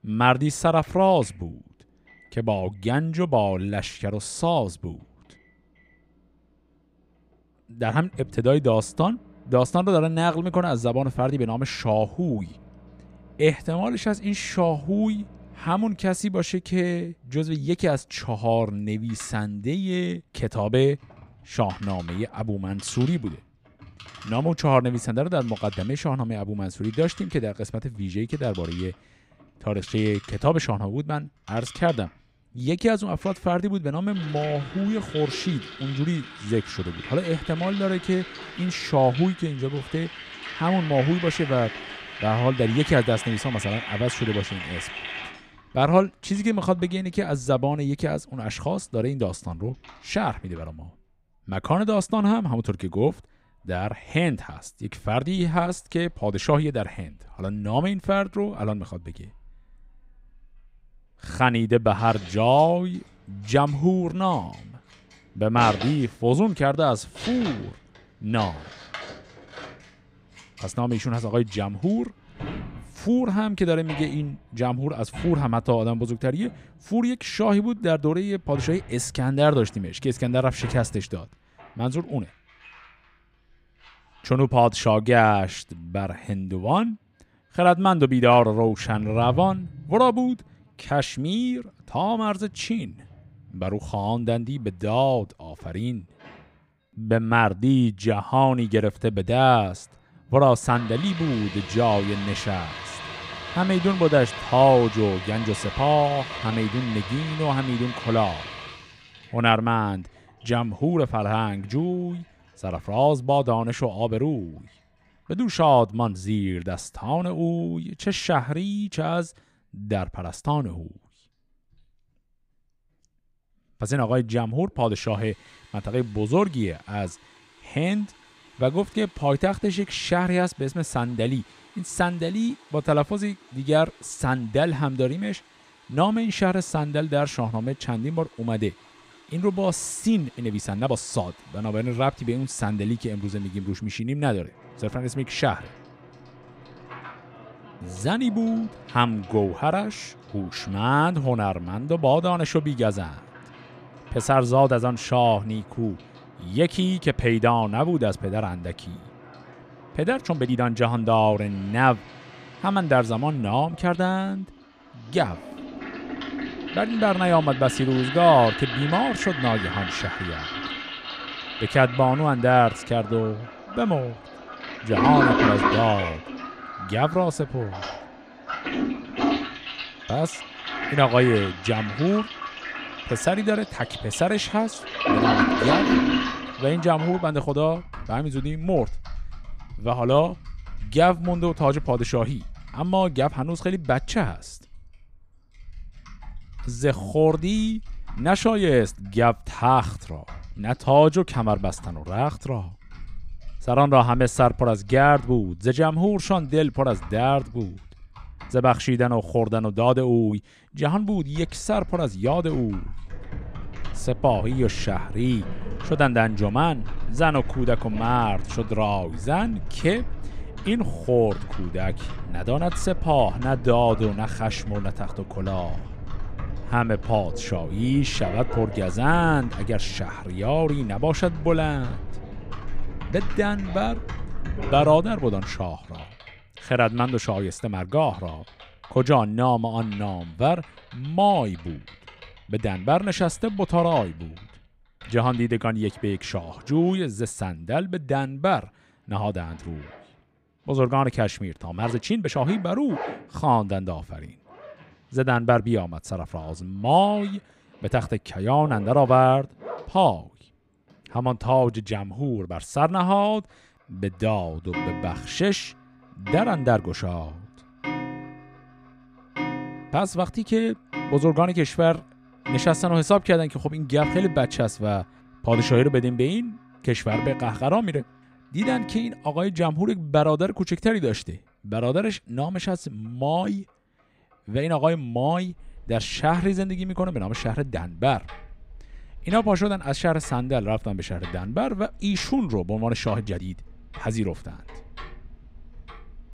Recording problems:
household noises; loud; throughout; 10 dB below the speech
uneven, jittery; strongly; from 1:28 to 4:53

